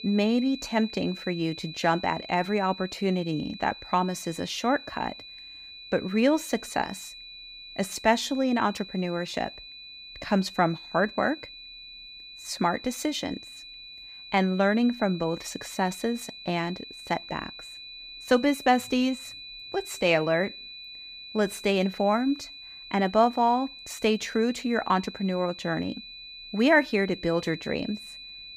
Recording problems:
high-pitched whine; noticeable; throughout; 4 kHz, 15 dB below the speech

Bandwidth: 15.5 kHz